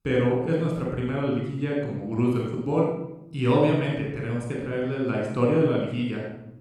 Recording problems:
off-mic speech; far
room echo; noticeable; dies away in 0.7 s

